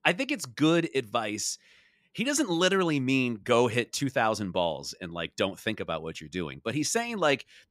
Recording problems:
none

